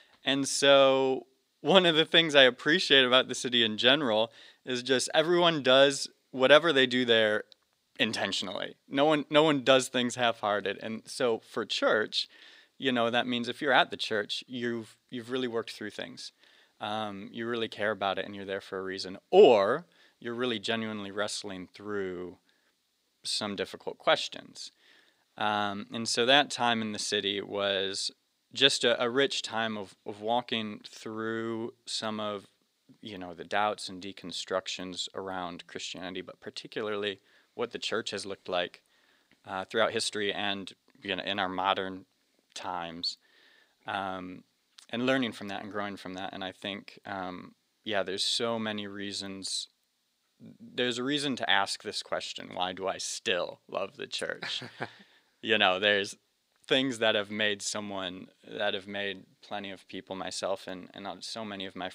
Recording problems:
thin; very slightly; fading below 300 Hz

